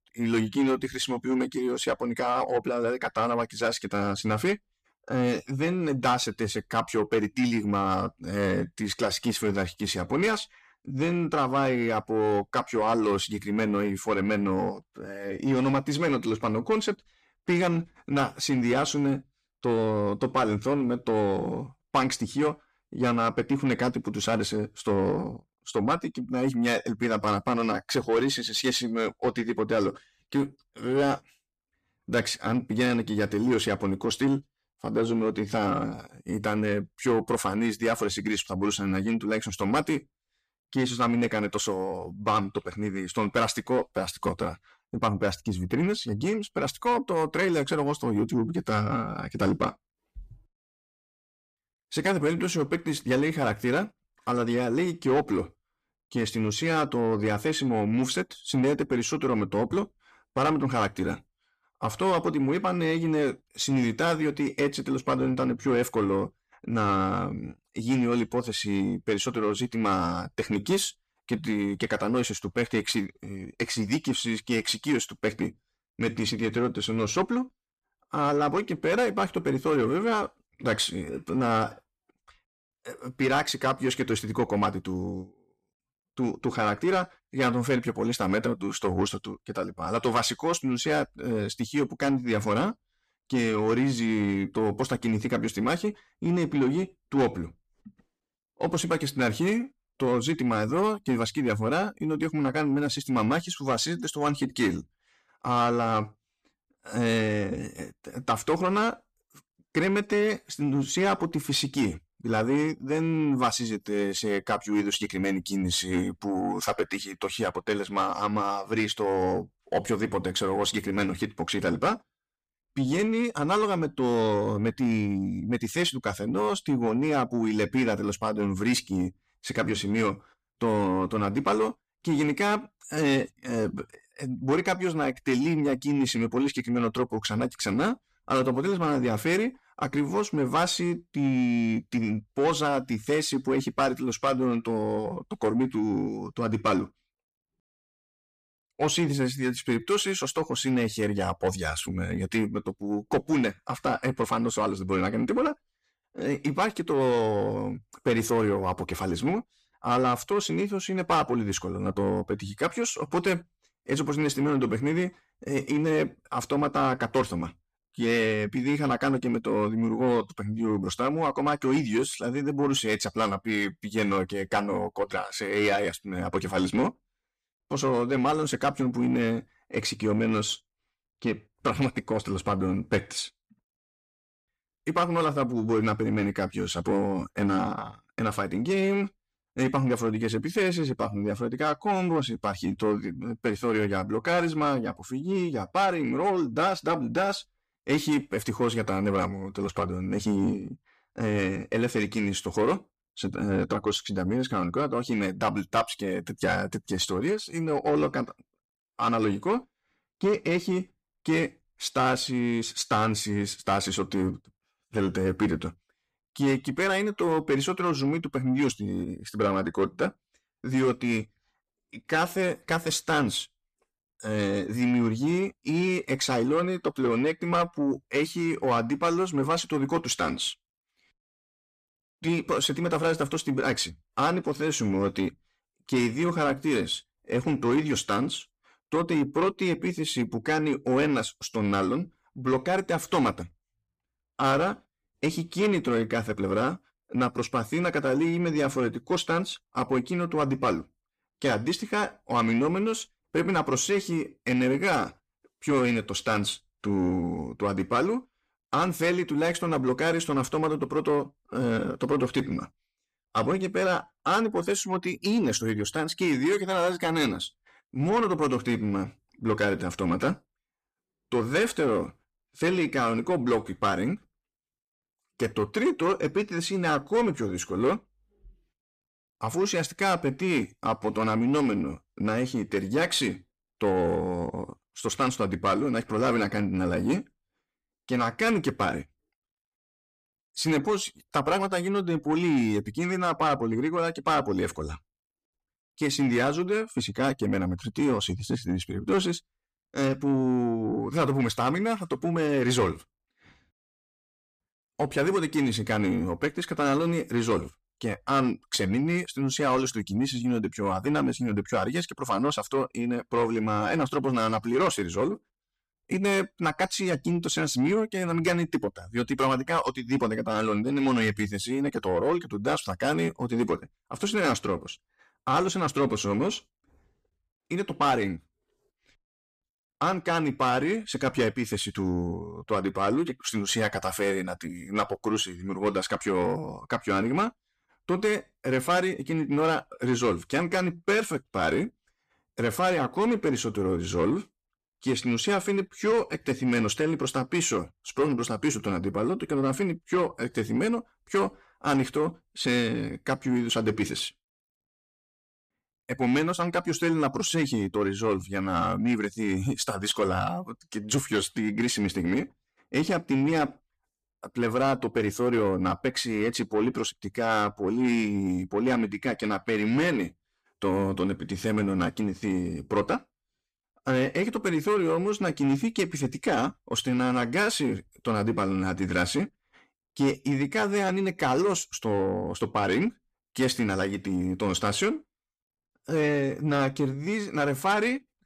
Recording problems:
distortion; slight; 10 dB below the speech

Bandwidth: 14.5 kHz